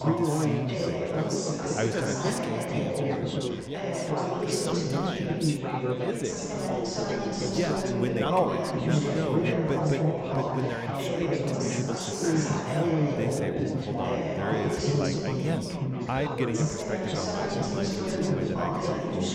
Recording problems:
chatter from many people; very loud; throughout; 5 dB above the speech

